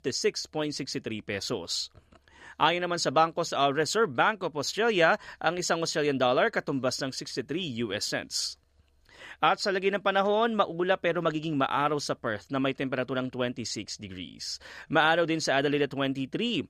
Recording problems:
none

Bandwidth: 15 kHz